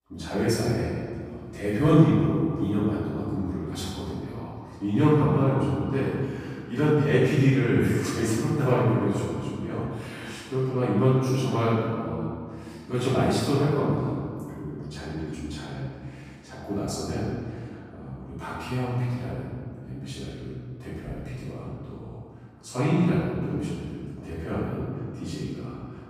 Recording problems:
room echo; strong; dies away in 2.2 s
off-mic speech; far

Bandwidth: 15 kHz